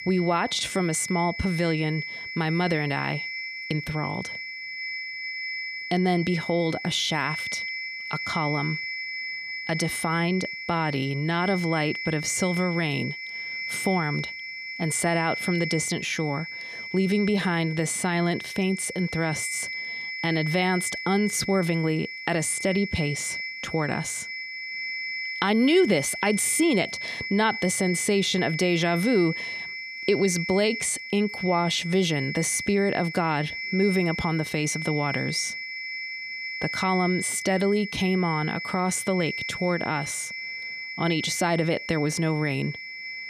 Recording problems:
high-pitched whine; loud; throughout; 2 kHz, 6 dB below the speech

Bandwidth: 14.5 kHz